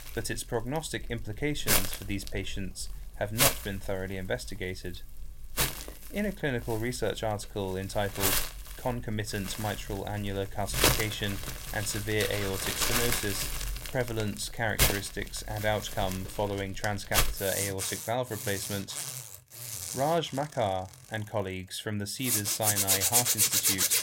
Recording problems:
household noises; very loud; throughout; 4 dB above the speech

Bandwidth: 16 kHz